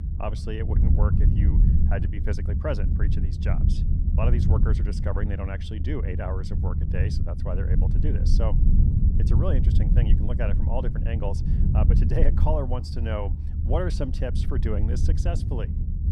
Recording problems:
low rumble; loud; throughout; 4 dB below the speech

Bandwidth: 15 kHz